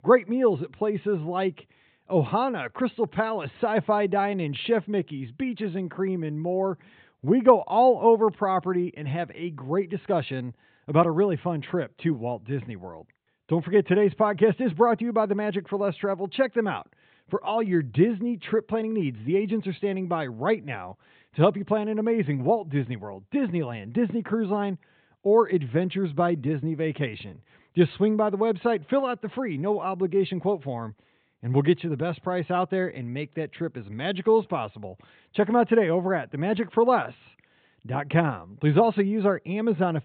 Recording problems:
high frequencies cut off; severe; nothing above 4 kHz

